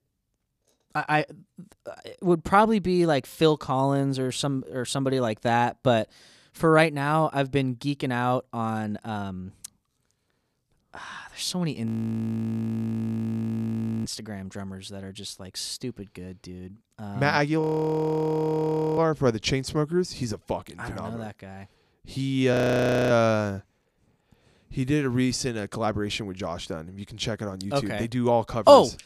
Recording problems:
audio freezing; at 12 s for 2 s, at 18 s for 1.5 s and at 23 s for 0.5 s

